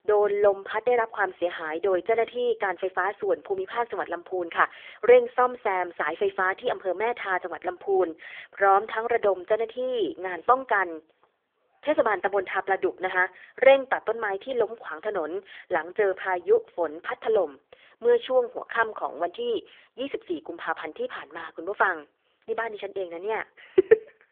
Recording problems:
phone-call audio; poor line; nothing above 3.5 kHz

